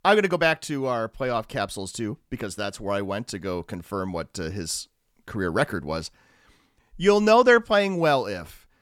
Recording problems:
none

